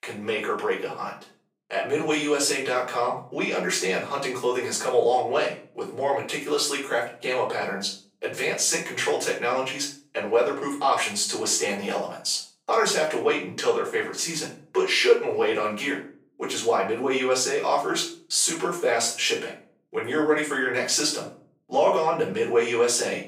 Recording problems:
off-mic speech; far
thin; somewhat; fading below 500 Hz
room echo; slight; dies away in 0.4 s

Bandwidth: 15.5 kHz